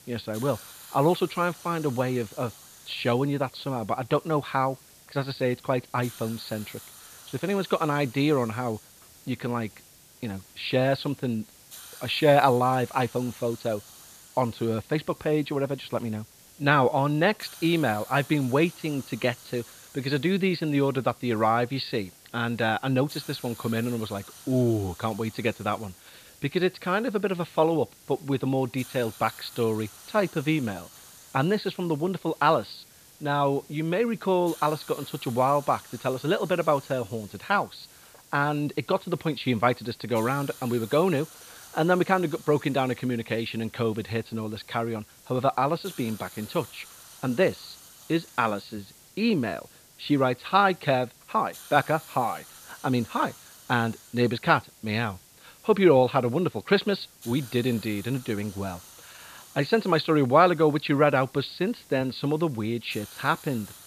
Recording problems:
high frequencies cut off; severe; nothing above 4.5 kHz
hiss; faint; throughout; 20 dB below the speech

